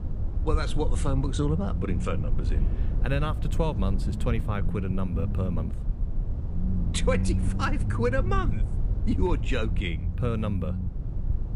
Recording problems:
low rumble; noticeable; throughout; 10 dB below the speech

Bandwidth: 15 kHz